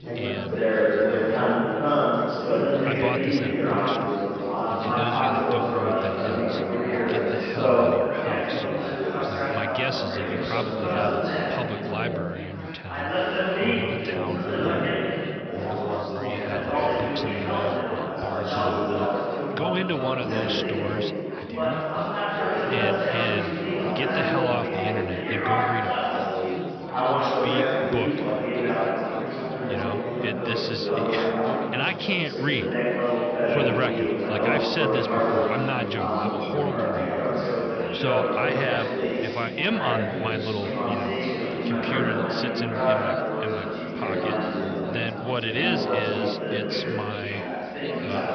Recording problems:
high frequencies cut off; noticeable; nothing above 5.5 kHz
chatter from many people; very loud; throughout; 5 dB above the speech

